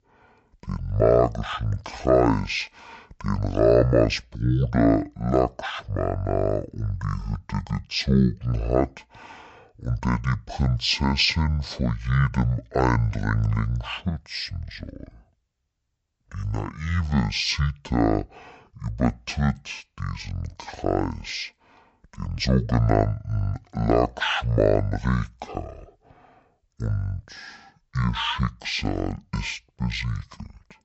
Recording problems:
wrong speed and pitch; too slow and too low; 0.5 times normal speed

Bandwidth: 8 kHz